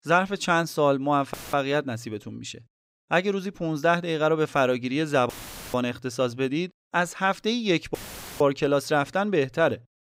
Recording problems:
audio cutting out; filled with static; at 1.5 s, at 5.5 s and at 8 s

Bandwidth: 15.5 kHz